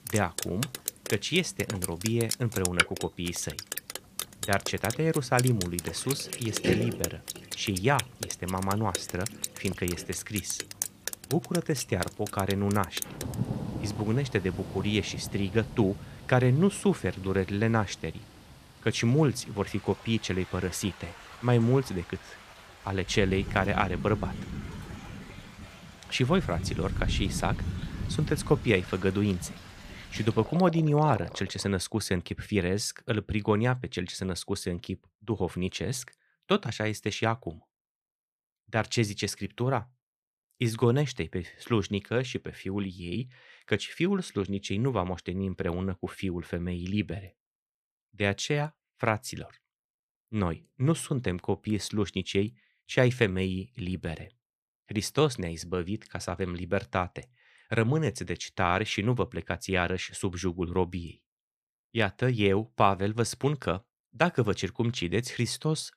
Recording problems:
rain or running water; loud; until 32 s; 7 dB below the speech

